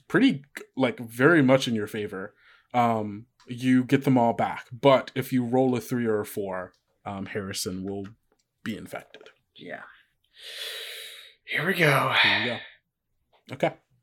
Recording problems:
none

